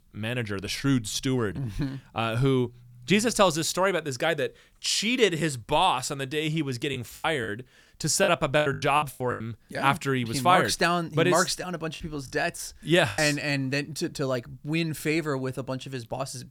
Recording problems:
choppy; very; from 7 to 9.5 s and from 12 to 13 s; 17% of the speech affected

